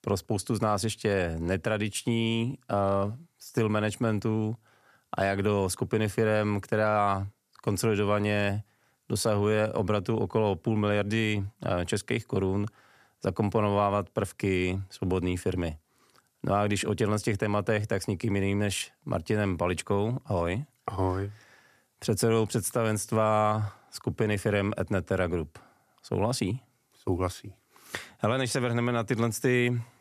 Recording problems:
none

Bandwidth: 14.5 kHz